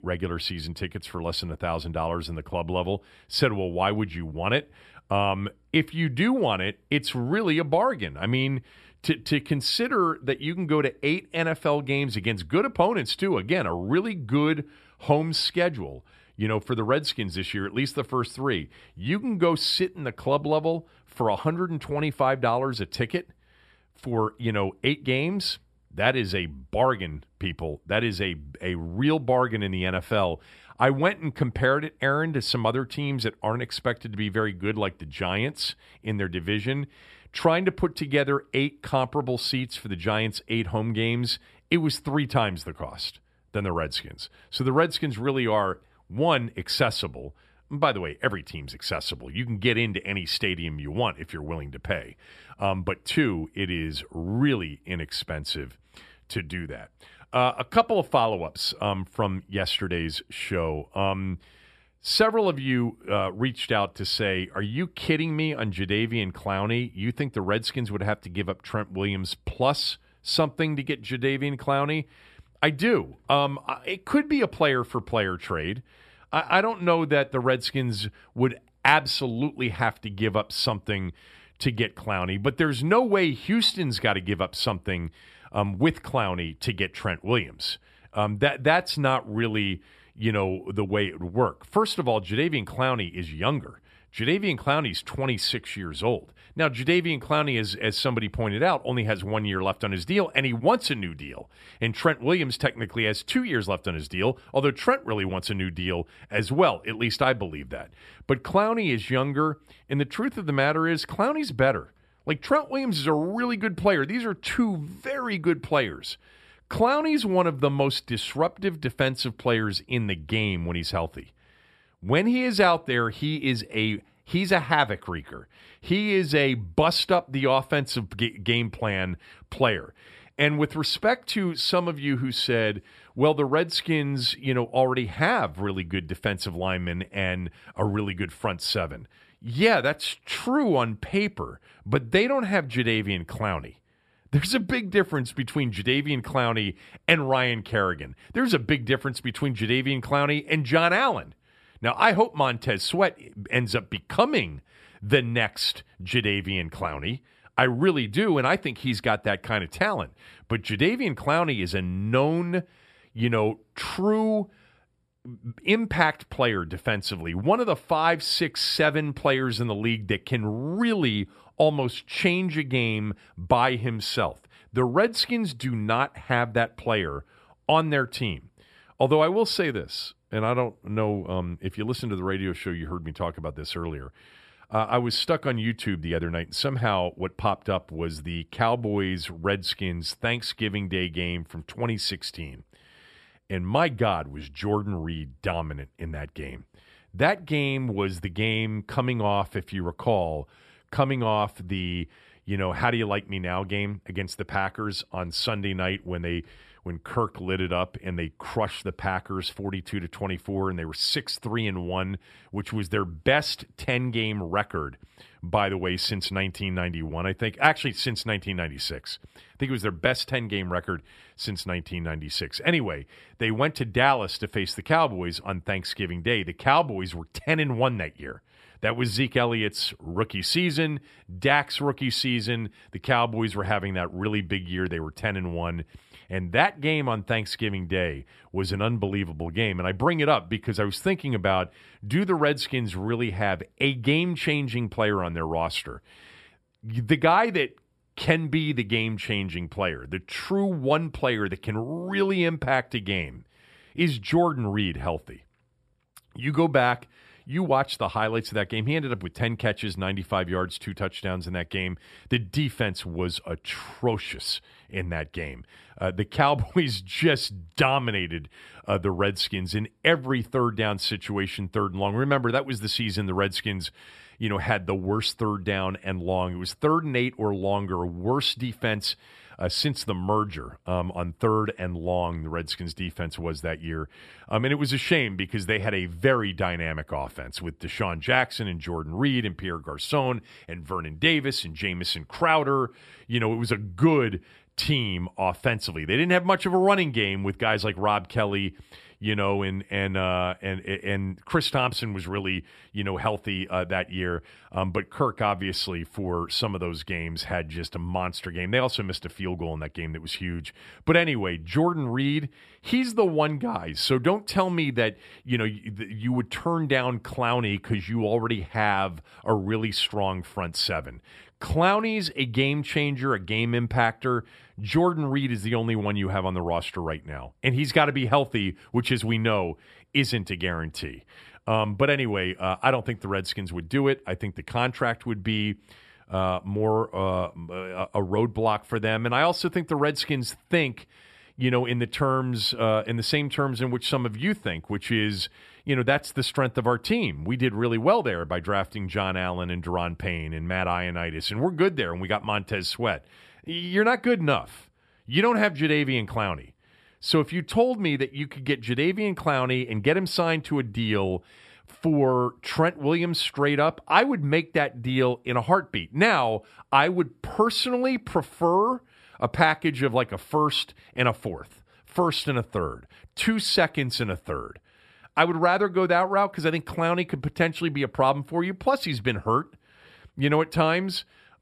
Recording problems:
none

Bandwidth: 14.5 kHz